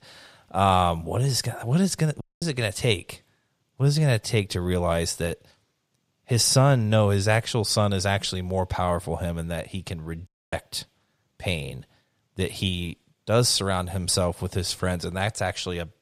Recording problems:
audio cutting out; at 2 s and at 10 s

